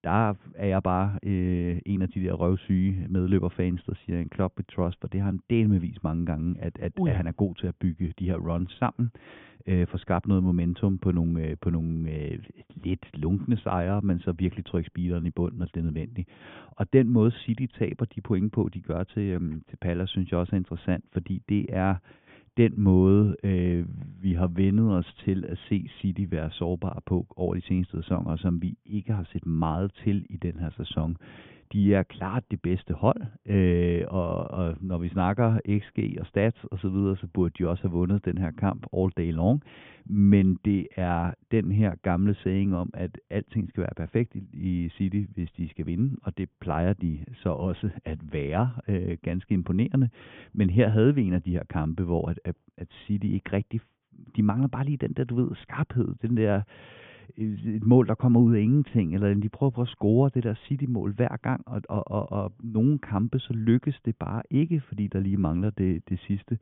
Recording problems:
high frequencies cut off; severe; nothing above 3.5 kHz

